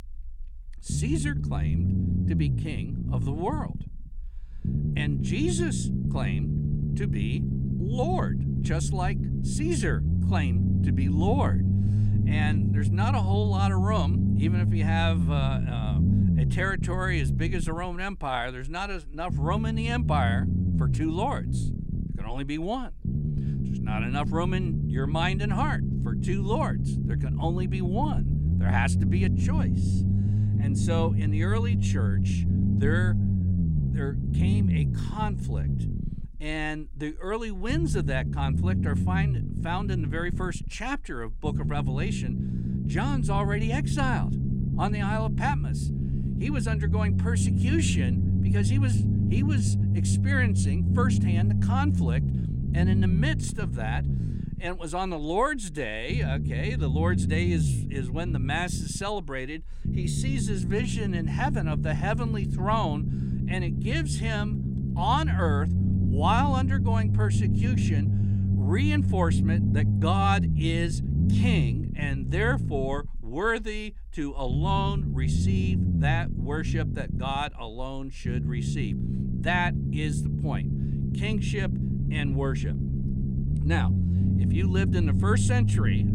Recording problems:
low rumble; loud; throughout; 5 dB below the speech

